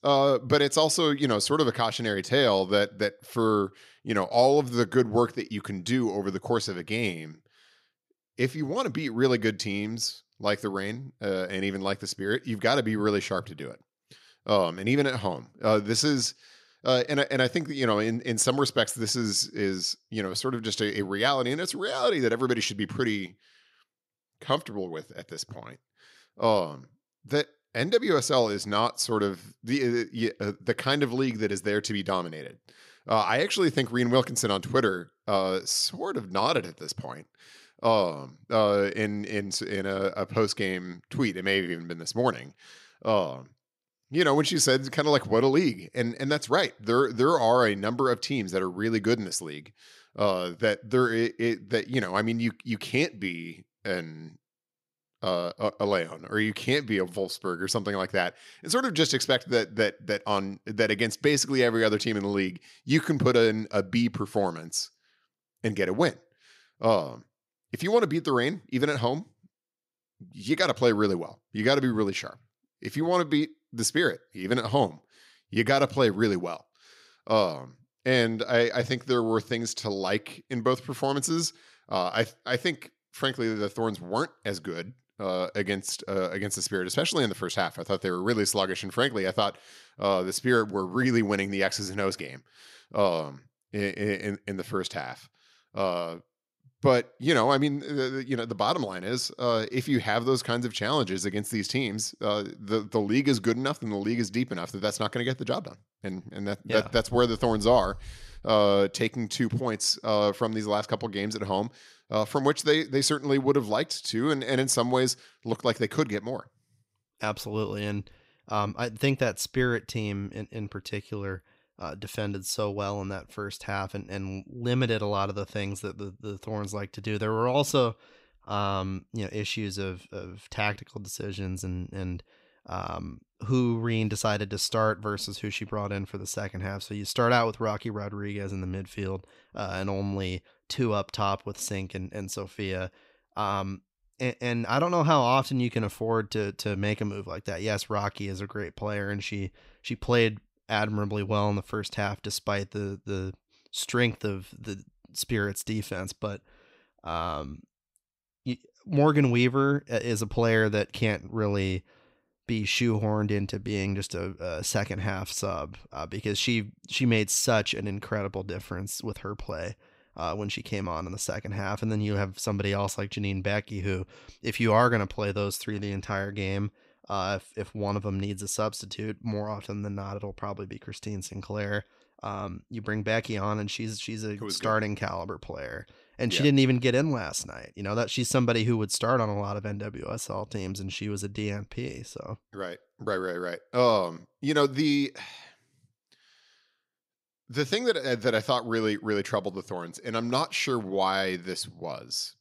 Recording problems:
none

